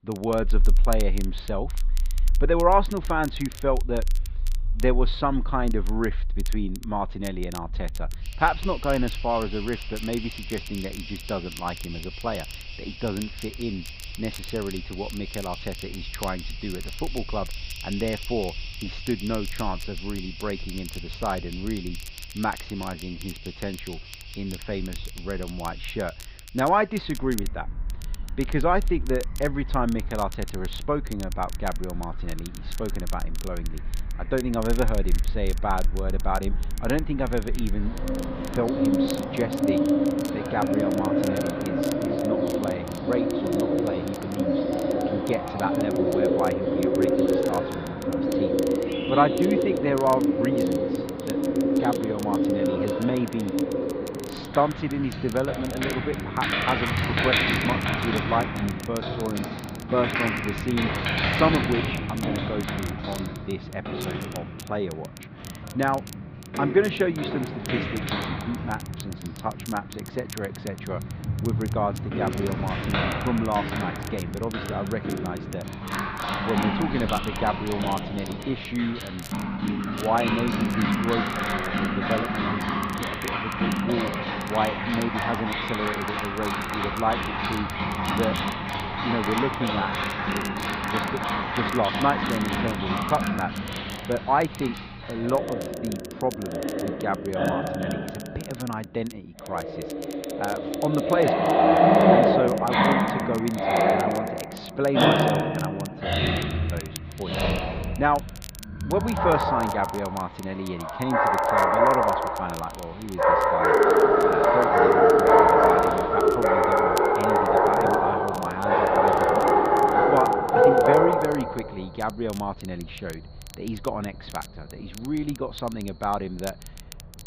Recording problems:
muffled; slightly; fading above 4 kHz
animal sounds; very loud; throughout; 4 dB above the speech
crackle, like an old record; noticeable; 15 dB below the speech

